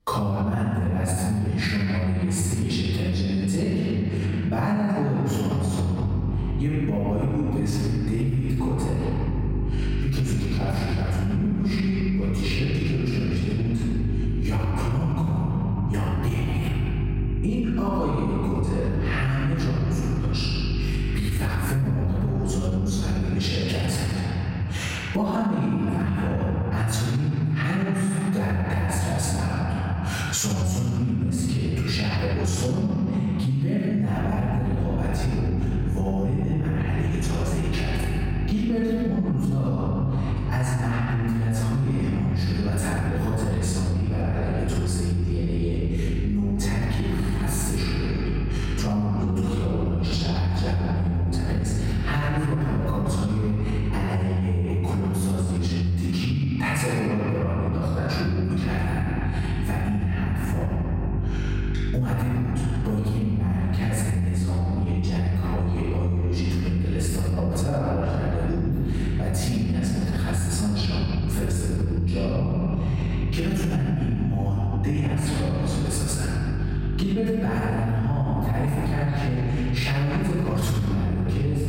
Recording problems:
room echo; strong; dies away in 2.6 s
off-mic speech; far
squashed, flat; somewhat
electrical hum; noticeable; from 6 to 23 s, from 34 to 54 s and from 59 s on; 50 Hz, 10 dB below the speech

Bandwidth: 16 kHz